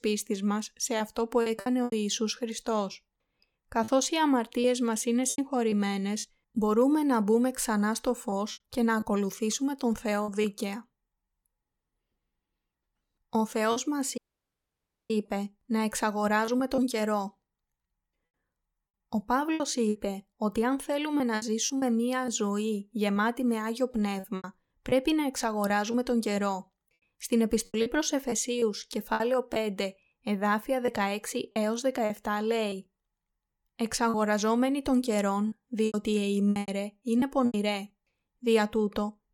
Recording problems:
choppy; very; 7% of the speech affected
audio cutting out; at 14 s for 1 s

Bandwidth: 17.5 kHz